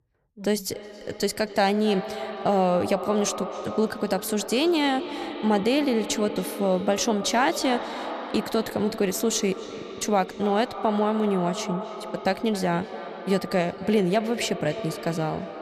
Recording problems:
echo of what is said; strong; throughout; 270 ms later, 10 dB below the speech

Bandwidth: 14 kHz